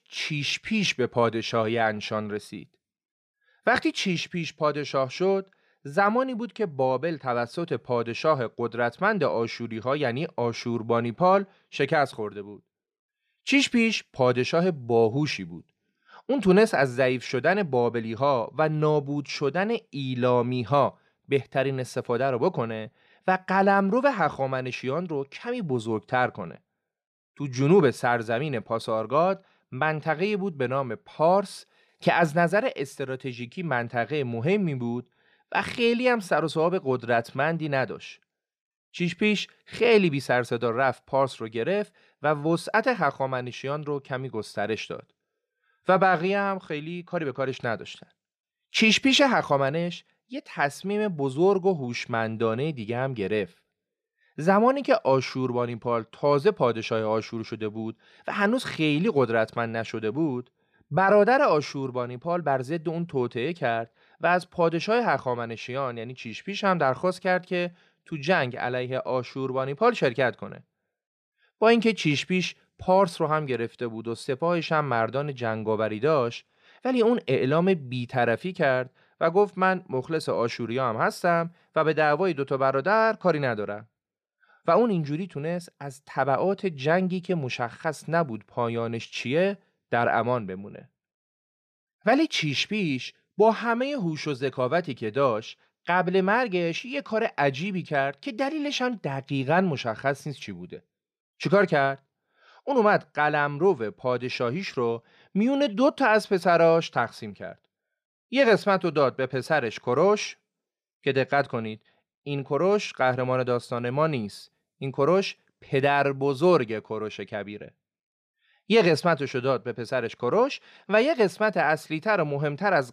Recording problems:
none

